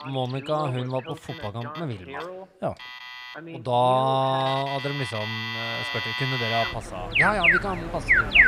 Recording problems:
alarms or sirens; very loud; throughout; 3 dB above the speech
animal sounds; noticeable; throughout; 15 dB below the speech
voice in the background; noticeable; throughout; 15 dB below the speech

